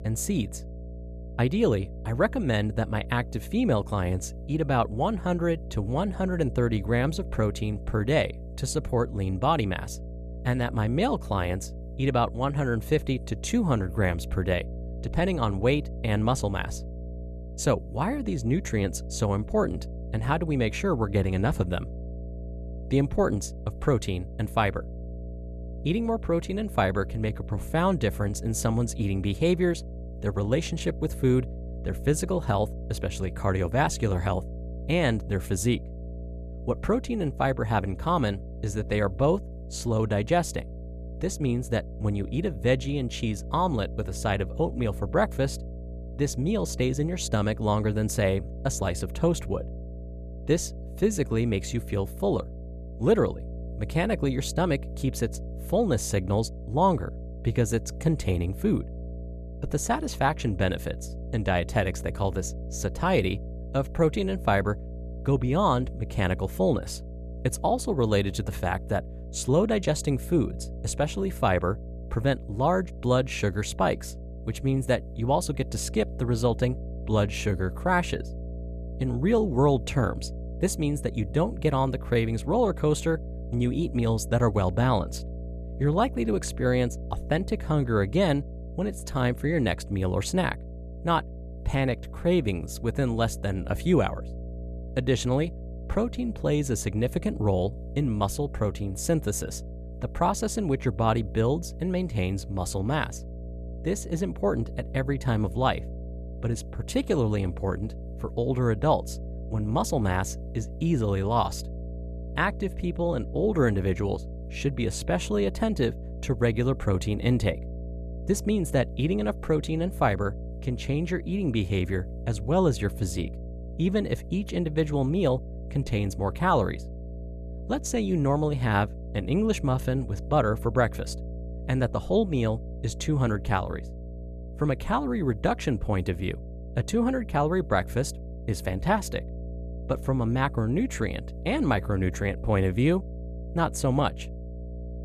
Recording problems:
electrical hum; noticeable; throughout; 60 Hz, 20 dB below the speech

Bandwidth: 14.5 kHz